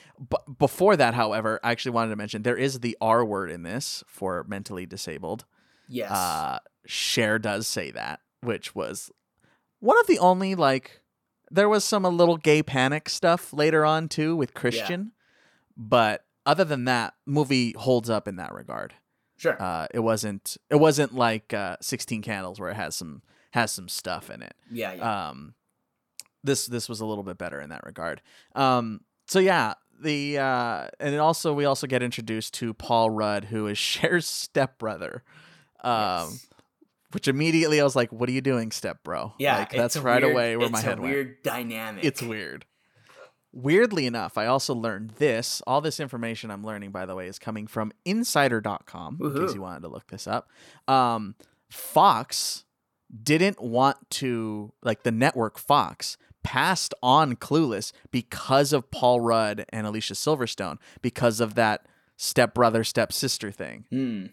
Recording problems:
none

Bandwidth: 18.5 kHz